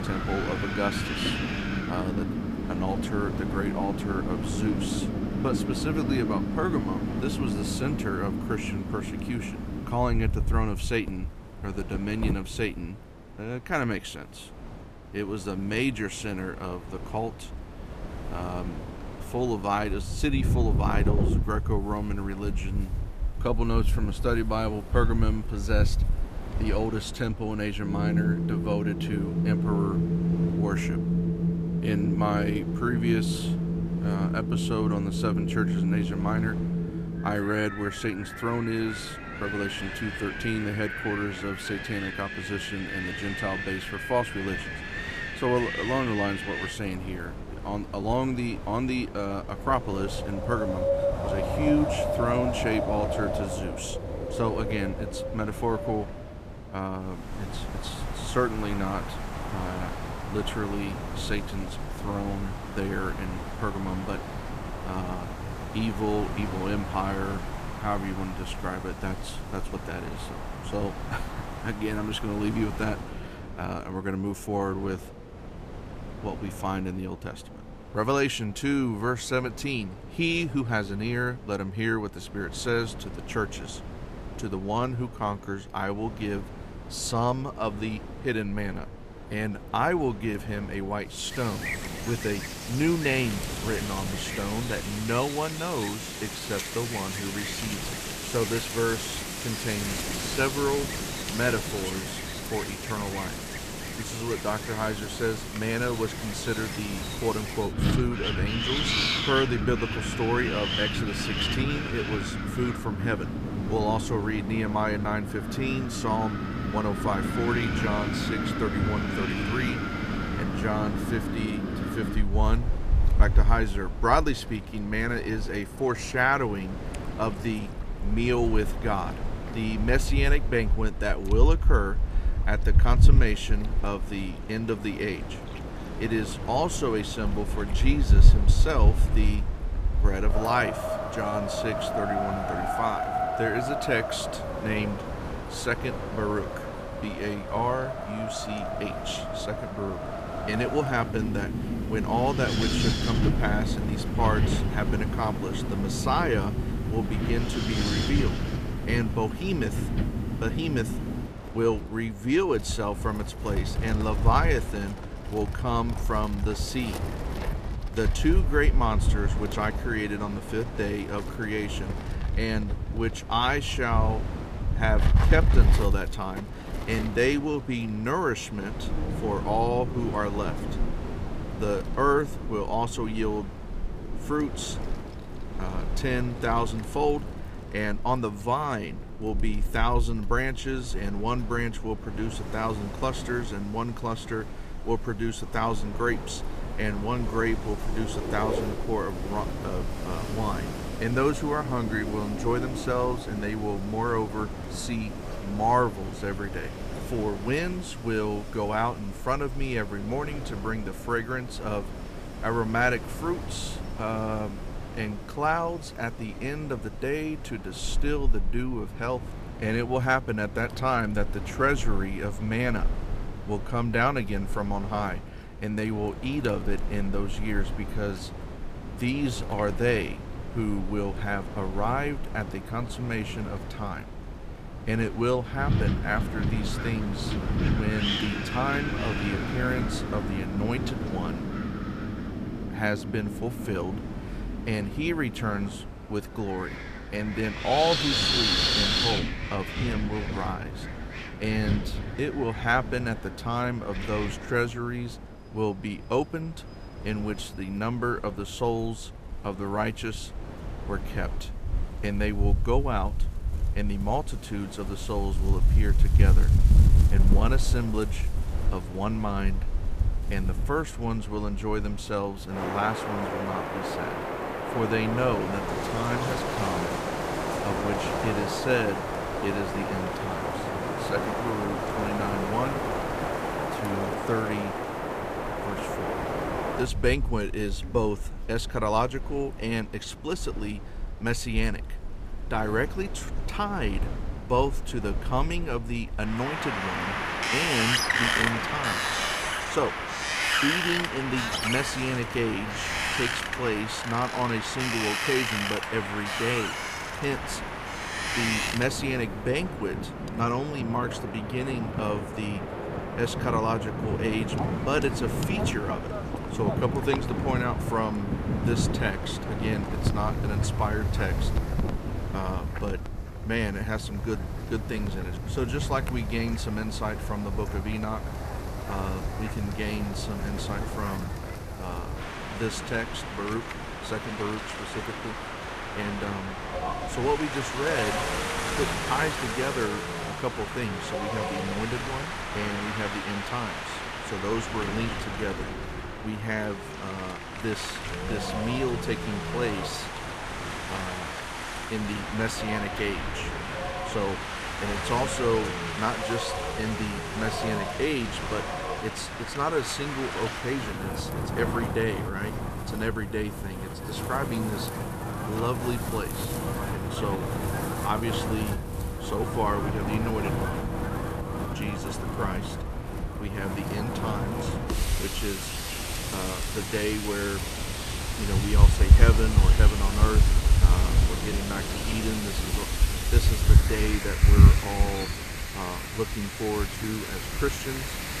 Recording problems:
wind in the background; very loud; throughout; as loud as the speech

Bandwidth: 14.5 kHz